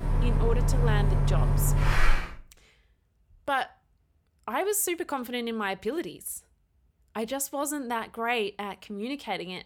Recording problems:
traffic noise; very loud; until 2 s; 5 dB above the speech

